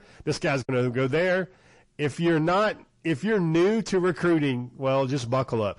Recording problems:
distortion; slight; 9 dB below the speech
garbled, watery; slightly; nothing above 10.5 kHz

